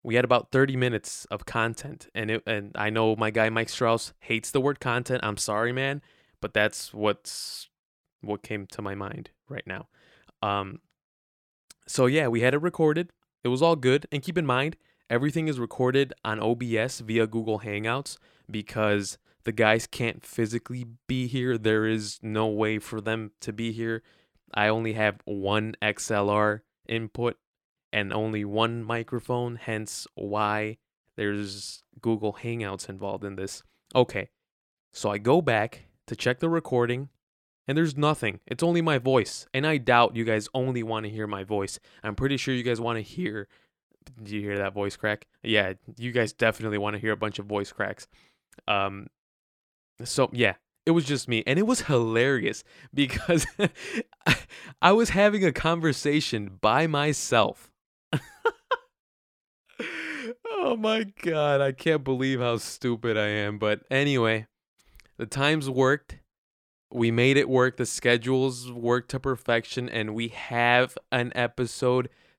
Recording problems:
none

